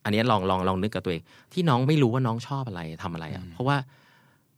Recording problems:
none

